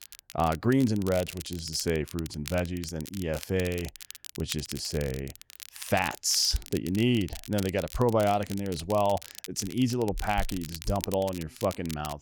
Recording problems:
crackle, like an old record; noticeable; 15 dB below the speech

